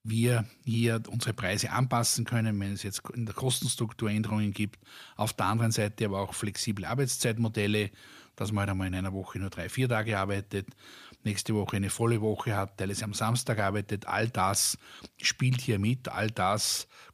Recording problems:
none

